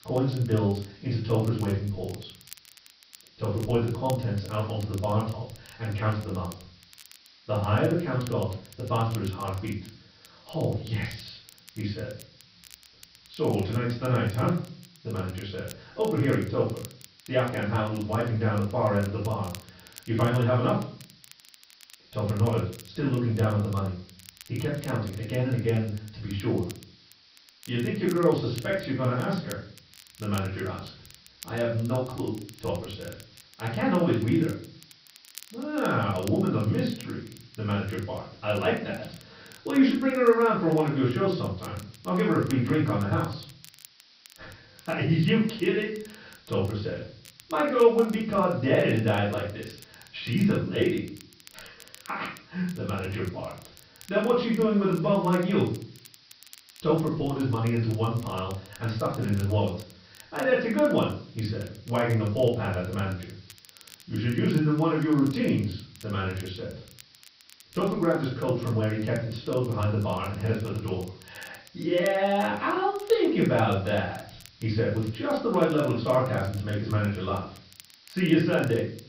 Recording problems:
off-mic speech; far
room echo; noticeable; dies away in 0.4 s
high frequencies cut off; noticeable; nothing above 5.5 kHz
hiss; faint; throughout; 25 dB below the speech
crackle, like an old record; faint; 25 dB below the speech

